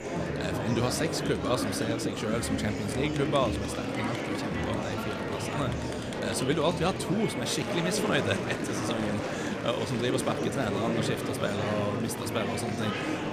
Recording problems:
murmuring crowd; loud; throughout; 1 dB below the speech

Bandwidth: 14.5 kHz